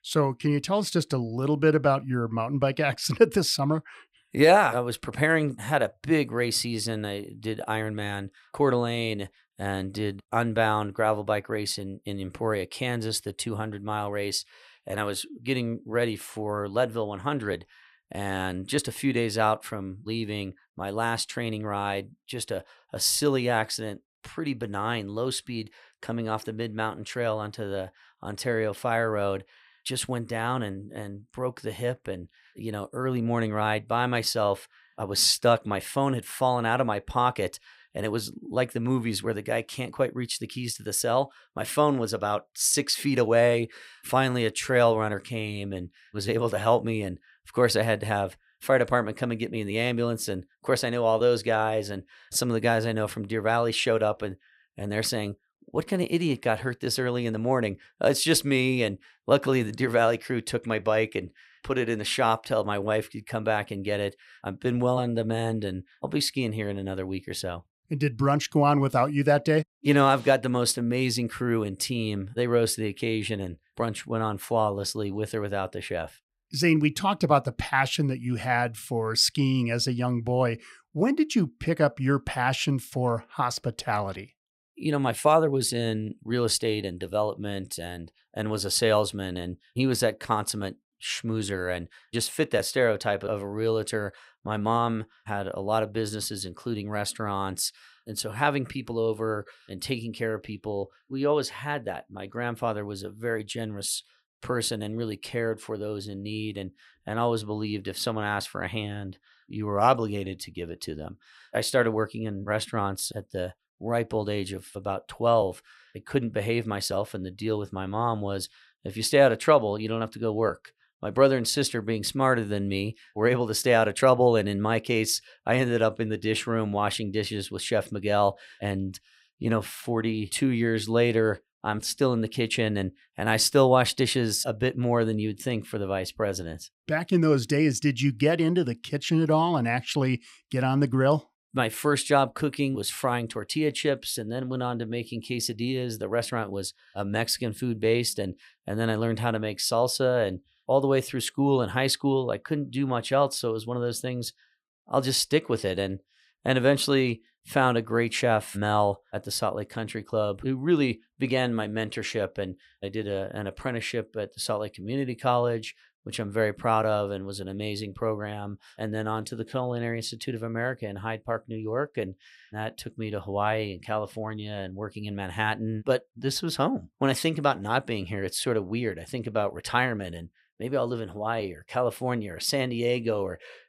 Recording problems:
none

